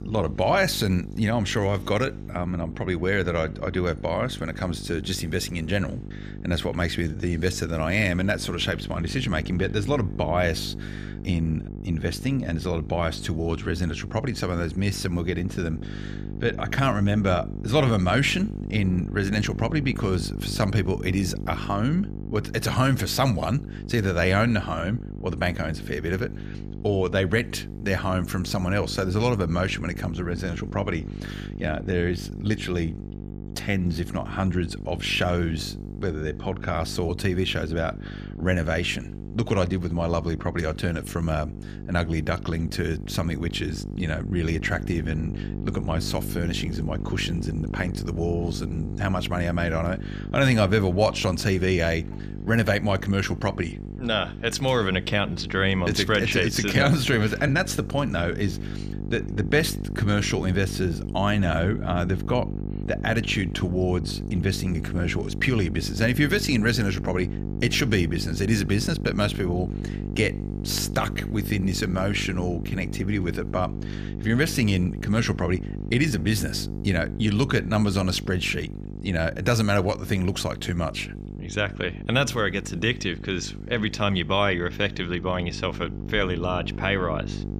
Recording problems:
electrical hum; noticeable; throughout; 50 Hz, 15 dB below the speech

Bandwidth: 14.5 kHz